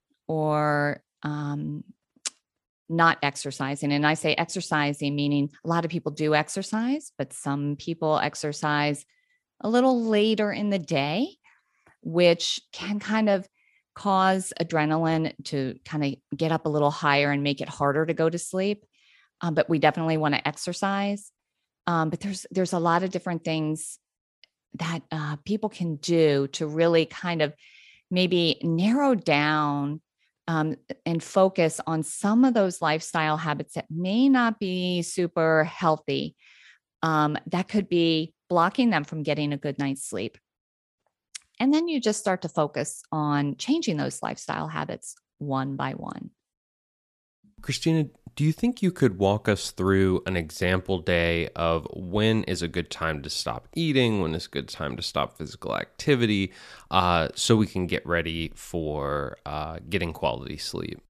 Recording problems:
none

